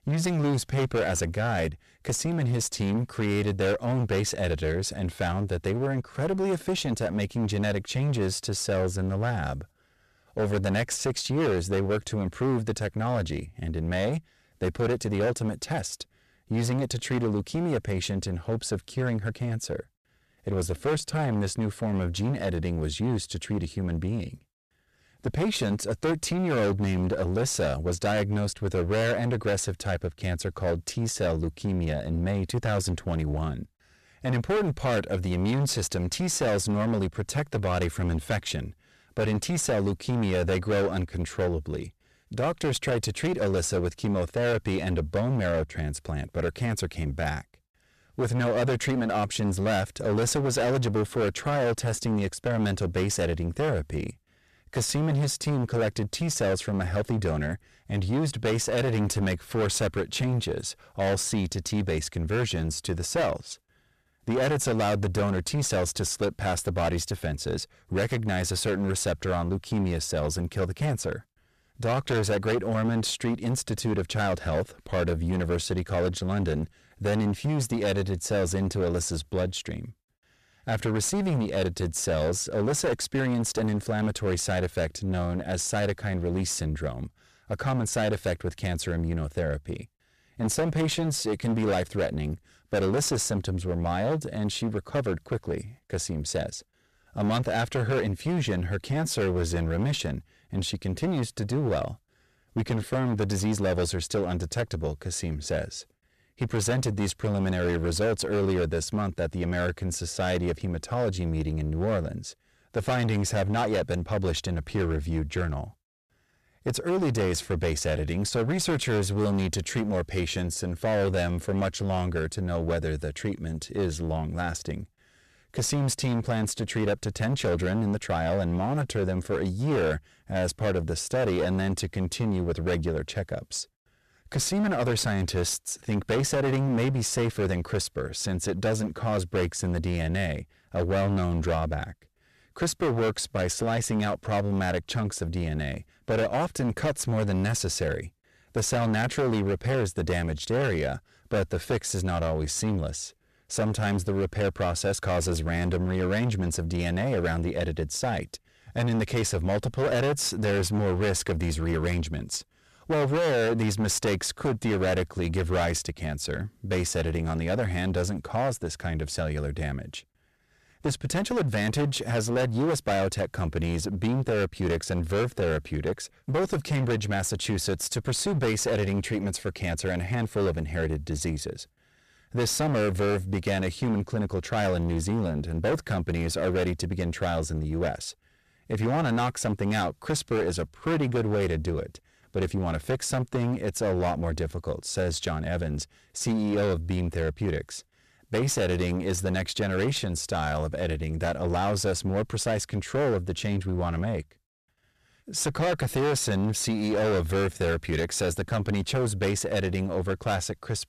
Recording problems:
distortion; heavy; 18% of the sound clipped

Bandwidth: 14.5 kHz